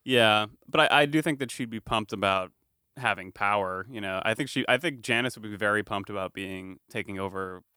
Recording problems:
none

